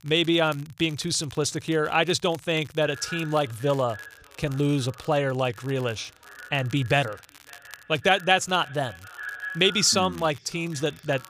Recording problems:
echo of what is said; noticeable; from 3 s on; 560 ms later, 15 dB below the speech
crackle, like an old record; faint; 25 dB below the speech

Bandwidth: 15 kHz